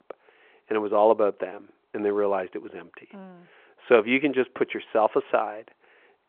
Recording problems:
phone-call audio; nothing above 3.5 kHz

